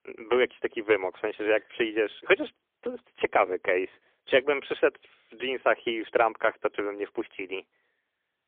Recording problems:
phone-call audio; poor line; nothing above 3.5 kHz

